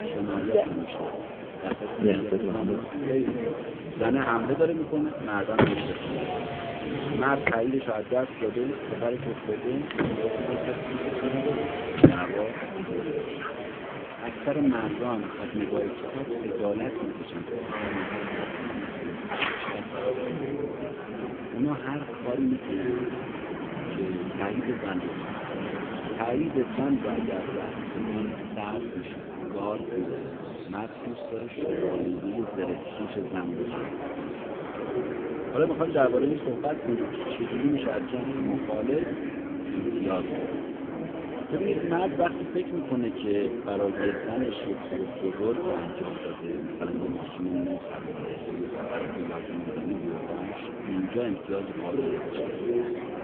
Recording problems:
phone-call audio; poor line
traffic noise; loud; throughout; 2 dB below the speech
murmuring crowd; loud; throughout; 3 dB below the speech

